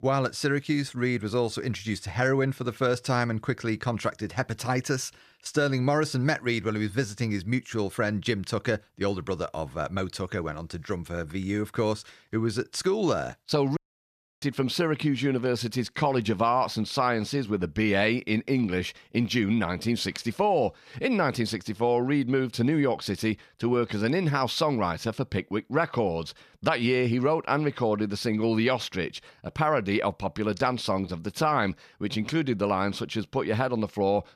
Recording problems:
audio cutting out; at 14 s for 0.5 s

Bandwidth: 14.5 kHz